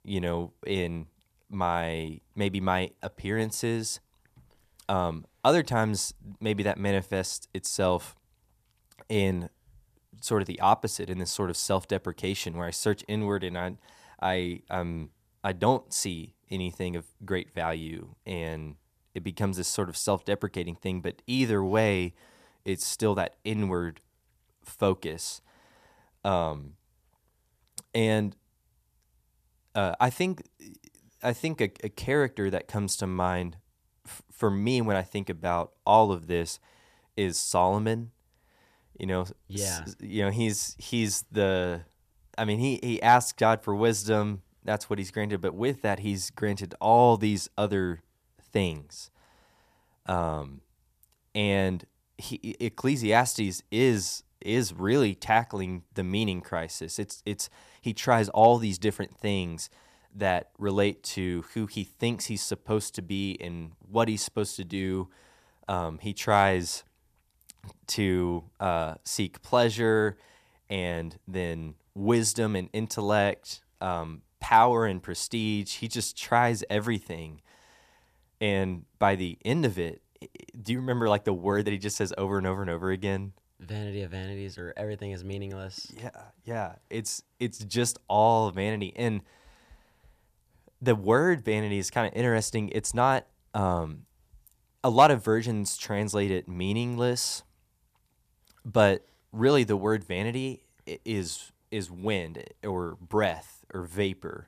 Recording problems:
none

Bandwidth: 14.5 kHz